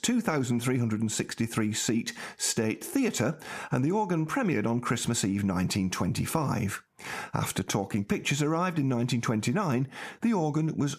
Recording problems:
squashed, flat; heavily

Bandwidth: 14.5 kHz